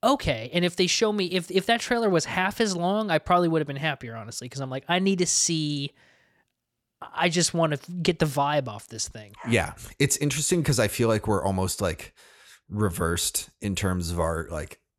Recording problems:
none

